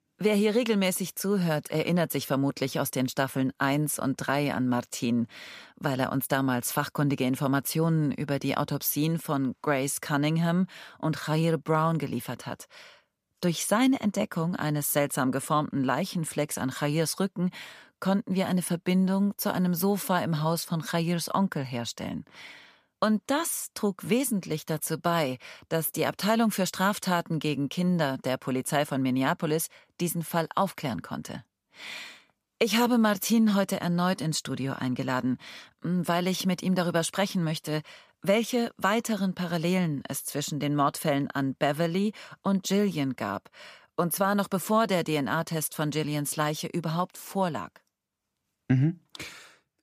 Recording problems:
none

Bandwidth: 14.5 kHz